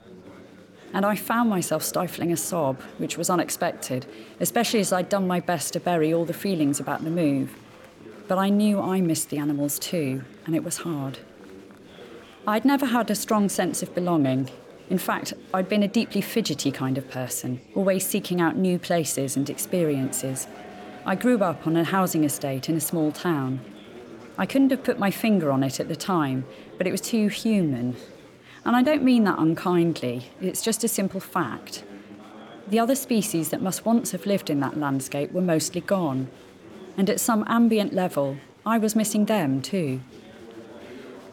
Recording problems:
chatter from many people; noticeable; throughout; 20 dB below the speech

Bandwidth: 17.5 kHz